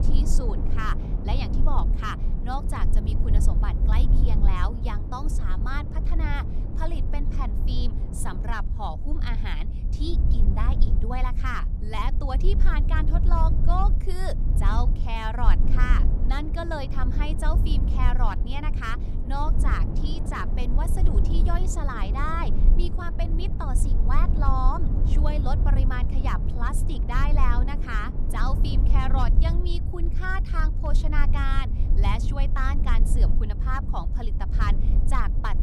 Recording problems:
wind noise on the microphone; occasional gusts; until 8.5 s and from 16 to 29 s; 10 dB below the speech
low rumble; noticeable; throughout; 10 dB below the speech

